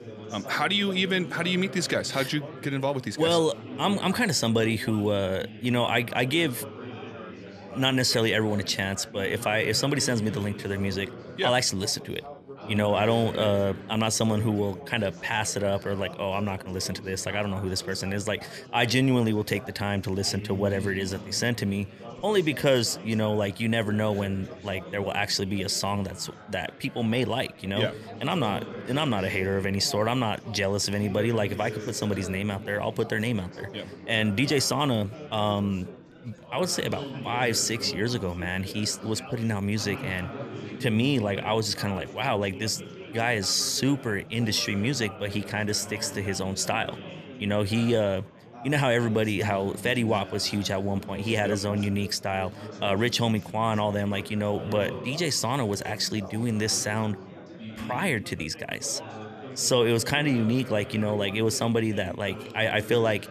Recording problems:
chatter from many people; noticeable; throughout; 15 dB below the speech

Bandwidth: 14 kHz